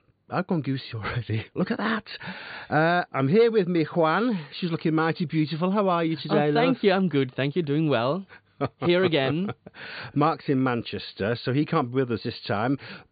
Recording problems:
high frequencies cut off; severe; nothing above 4.5 kHz

